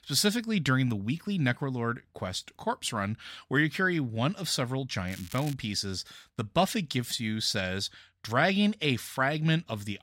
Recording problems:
crackling; noticeable; at 5 s; 15 dB below the speech

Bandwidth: 16 kHz